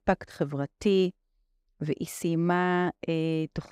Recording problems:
none

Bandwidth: 15.5 kHz